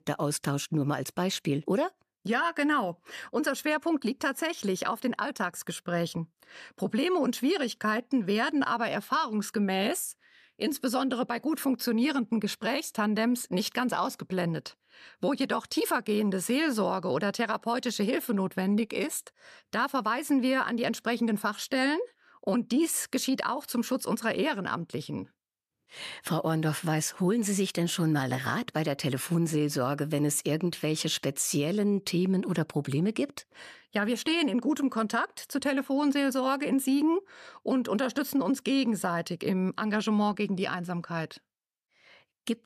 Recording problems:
none

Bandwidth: 14.5 kHz